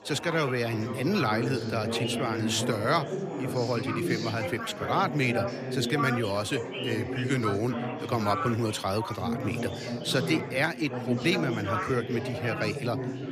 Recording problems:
chatter from many people; loud; throughout; 3 dB below the speech

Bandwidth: 14.5 kHz